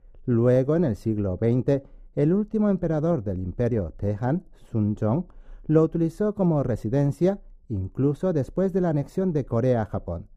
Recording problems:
muffled; very; fading above 1 kHz

